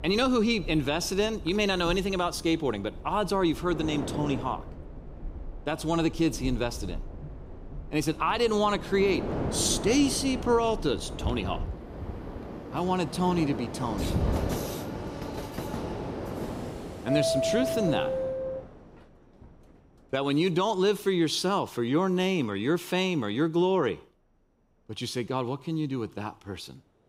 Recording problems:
train or aircraft noise; loud; throughout; 8 dB below the speech

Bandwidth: 15.5 kHz